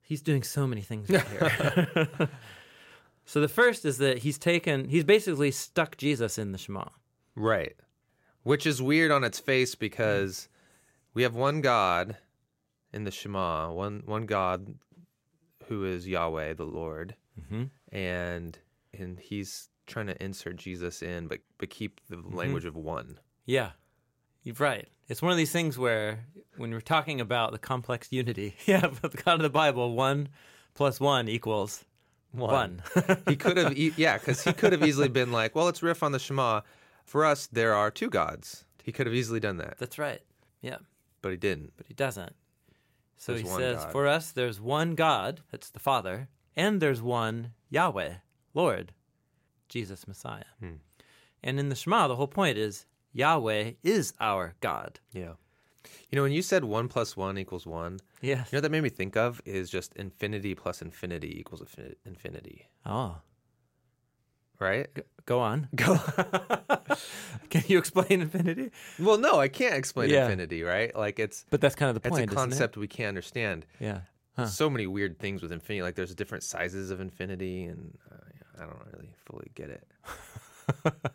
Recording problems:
none

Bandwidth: 16 kHz